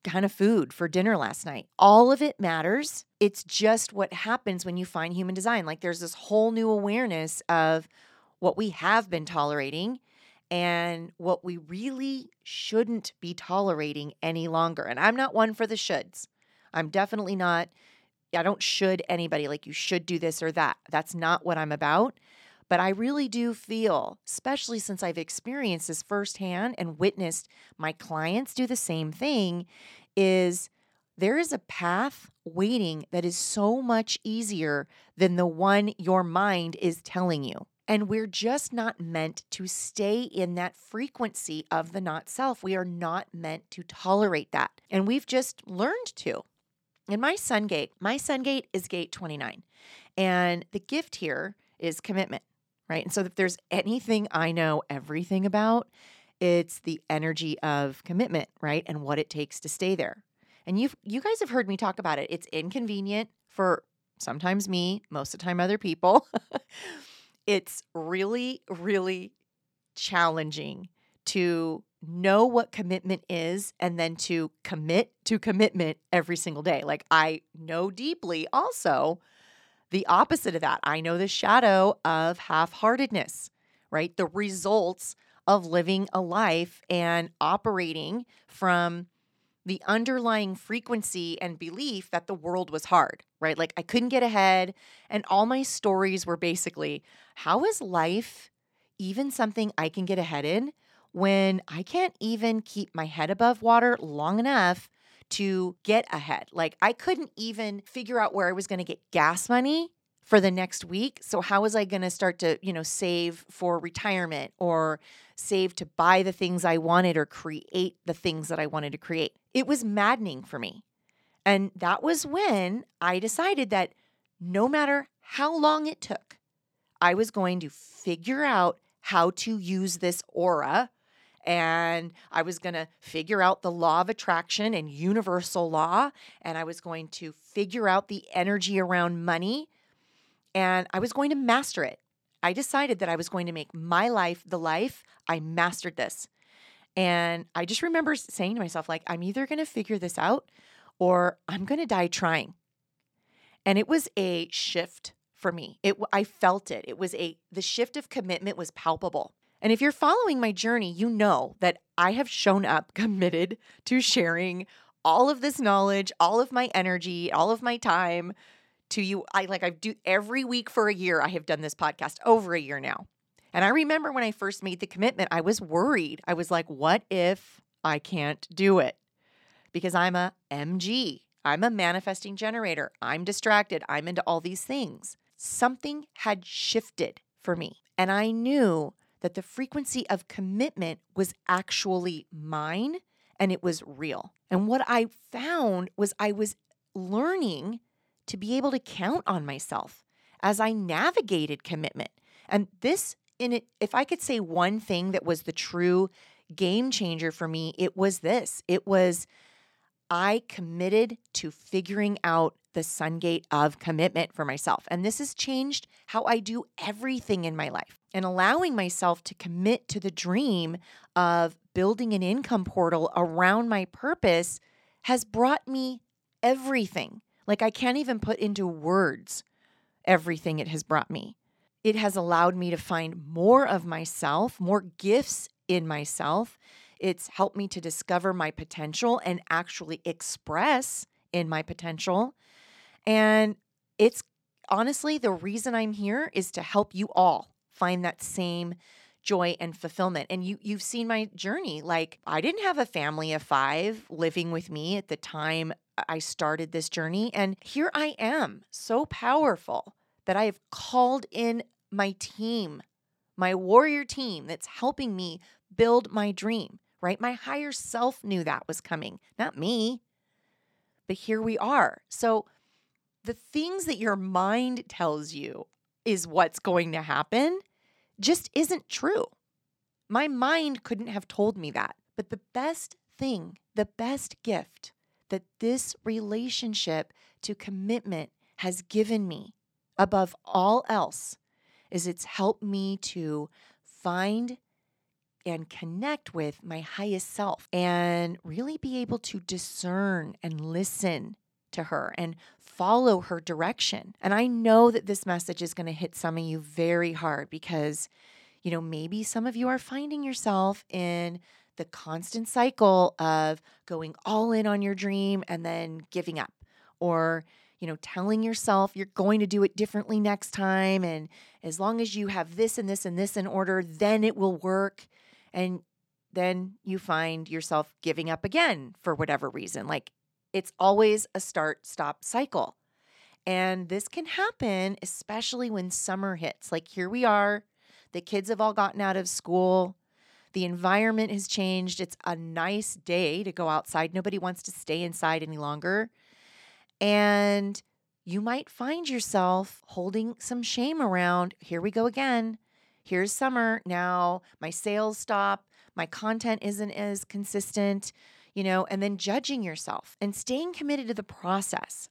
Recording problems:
none

